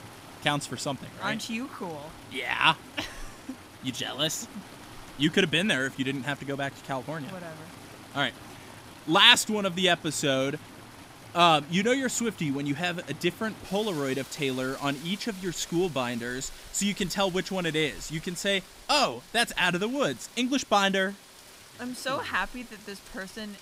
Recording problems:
rain or running water; noticeable; throughout; 20 dB below the speech

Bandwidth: 15.5 kHz